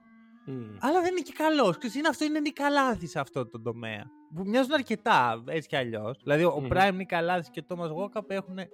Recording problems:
background music; faint; throughout; 25 dB below the speech

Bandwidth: 17 kHz